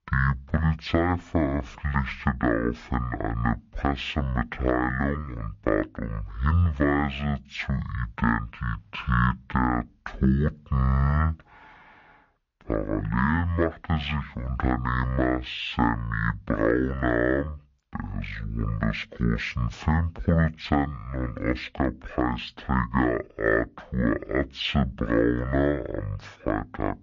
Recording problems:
wrong speed and pitch; too slow and too low; 0.5 times normal speed

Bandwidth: 7 kHz